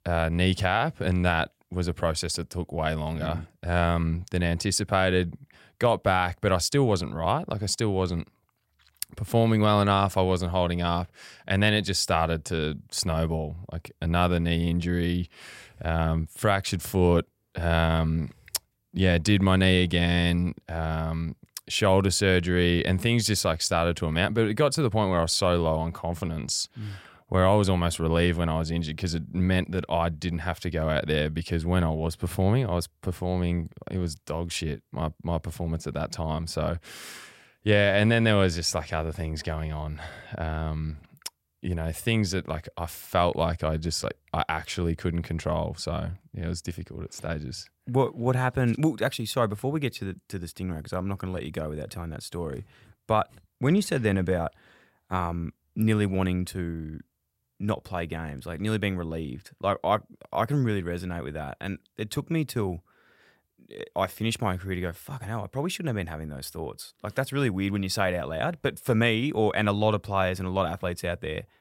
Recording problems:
none

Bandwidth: 16 kHz